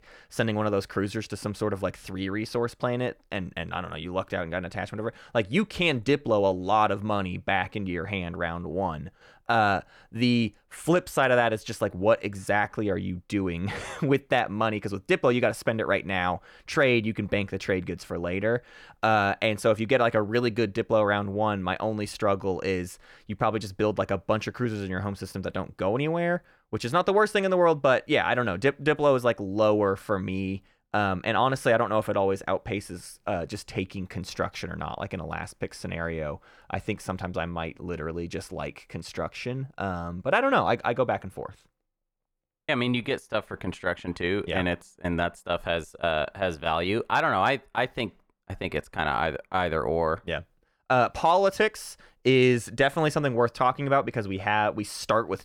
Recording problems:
none

